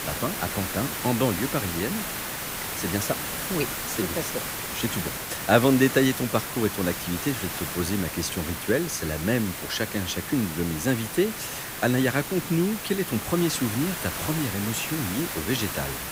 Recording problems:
hiss; loud; throughout; 4 dB below the speech

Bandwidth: 15.5 kHz